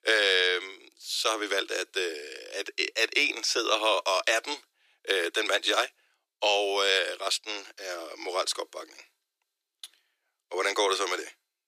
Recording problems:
thin; very; fading below 300 Hz

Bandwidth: 14.5 kHz